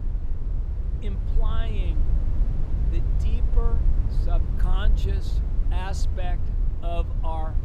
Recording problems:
low rumble; loud; throughout; 6 dB below the speech

